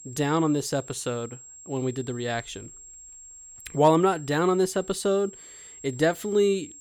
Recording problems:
high-pitched whine; noticeable; throughout; 7.5 kHz, 20 dB below the speech

